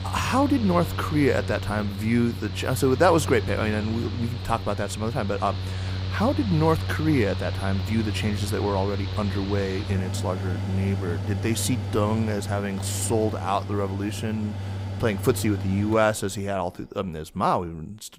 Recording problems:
machinery noise; loud; throughout; 5 dB below the speech

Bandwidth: 15.5 kHz